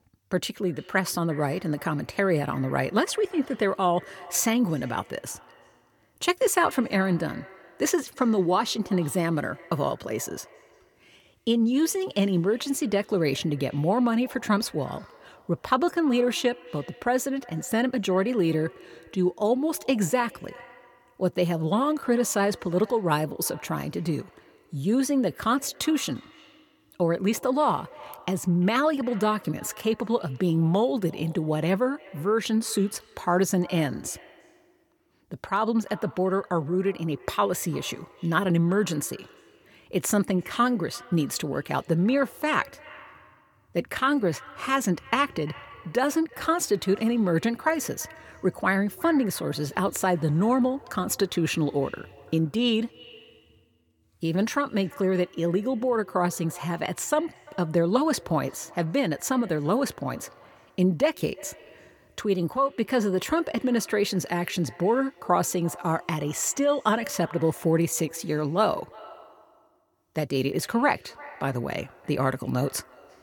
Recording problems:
echo of what is said; faint; throughout; 350 ms later, 20 dB below the speech

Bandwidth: 18 kHz